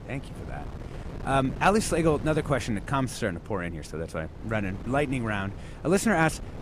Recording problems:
wind noise on the microphone; occasional gusts; 20 dB below the speech

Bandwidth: 14.5 kHz